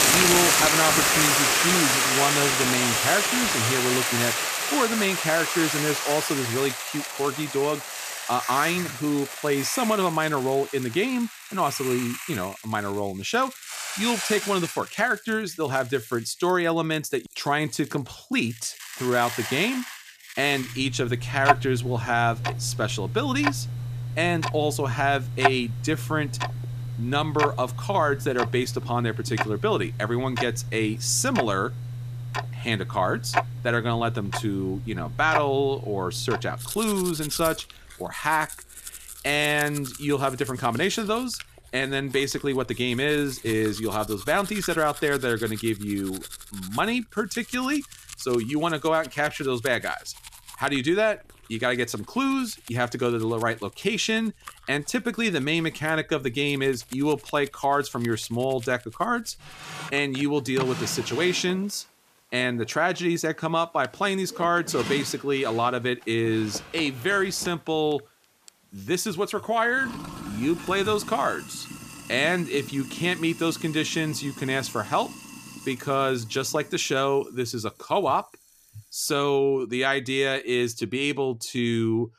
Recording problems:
household noises; loud; throughout; 2 dB below the speech

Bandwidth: 14.5 kHz